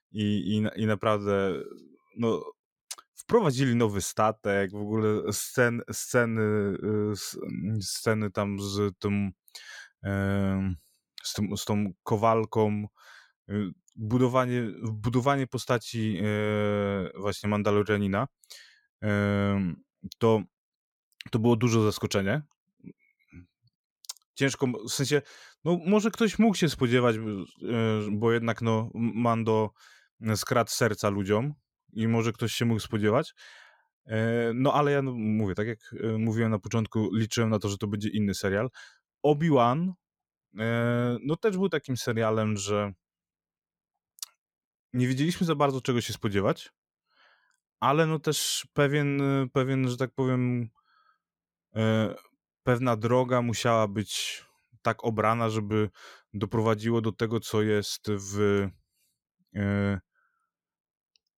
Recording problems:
none

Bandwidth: 17 kHz